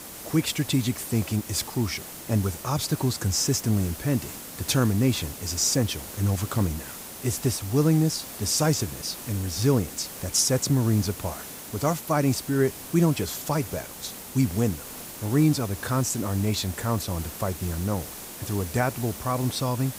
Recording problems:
hiss; noticeable; throughout; 10 dB below the speech

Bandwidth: 15.5 kHz